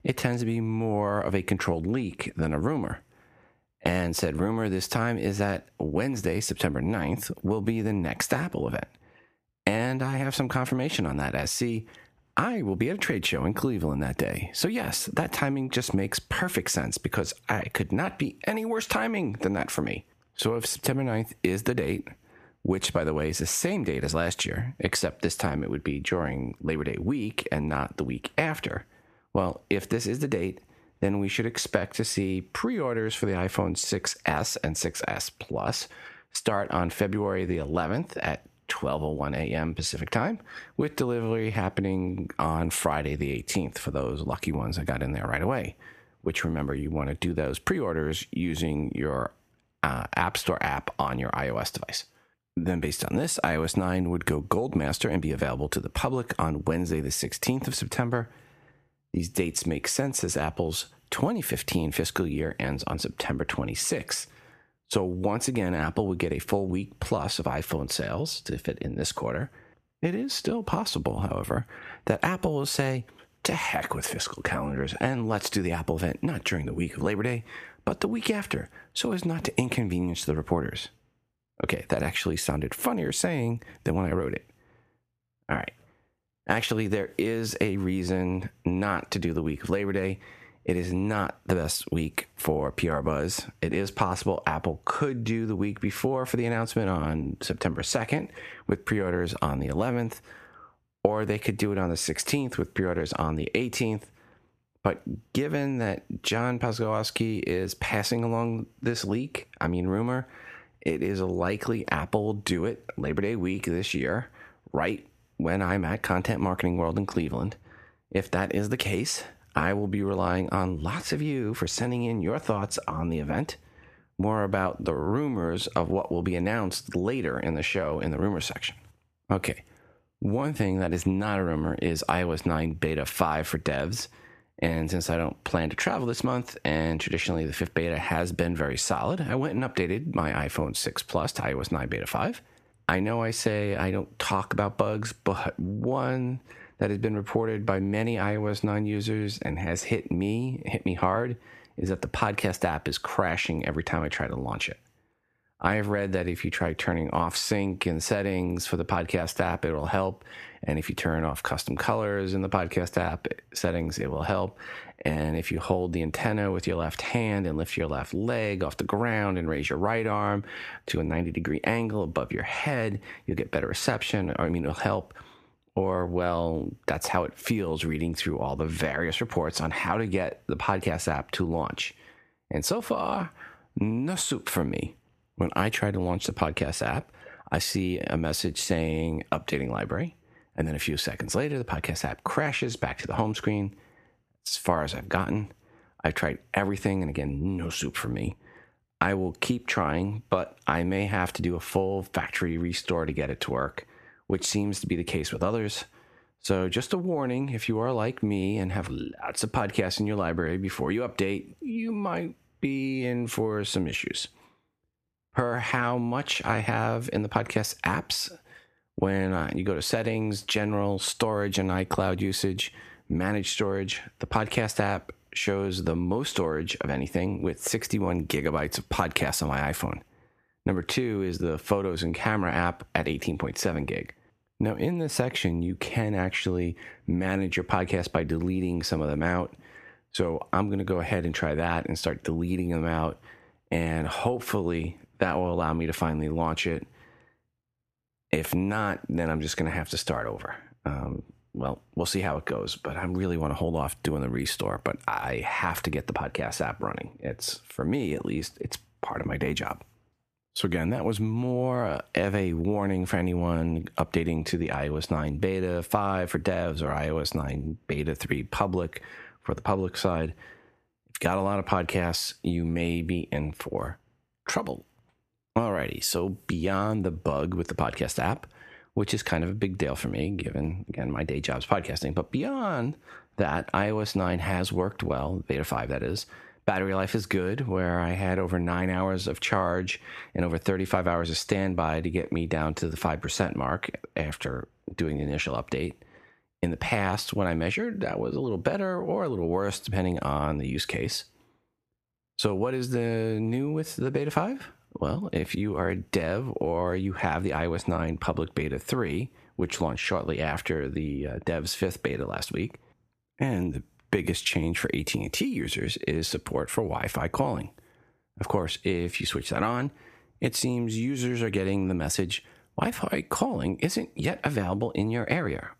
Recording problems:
squashed, flat; heavily

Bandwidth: 14.5 kHz